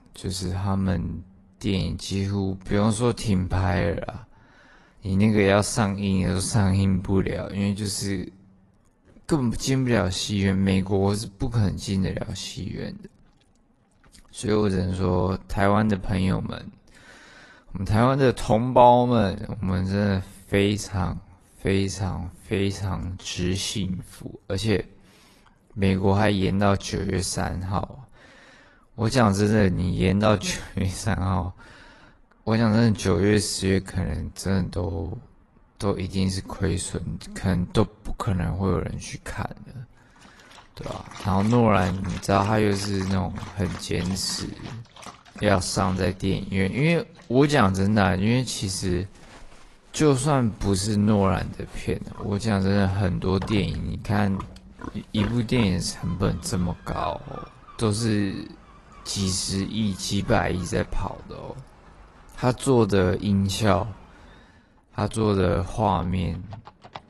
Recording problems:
wrong speed, natural pitch; too slow; 0.6 times normal speed
garbled, watery; slightly; nothing above 11.5 kHz
animal sounds; noticeable; from 41 s on; 20 dB below the speech

